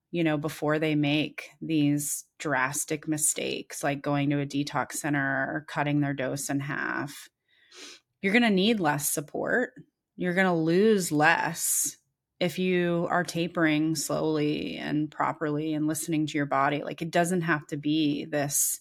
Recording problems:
none

